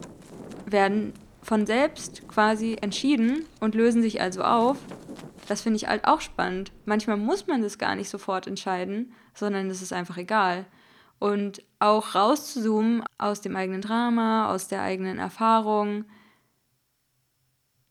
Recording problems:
wind in the background; faint; until 7 s; 20 dB below the speech

